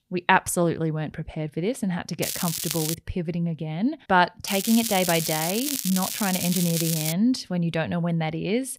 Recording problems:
crackling; loud; at 2 s and from 4.5 to 7 s; 3 dB below the speech

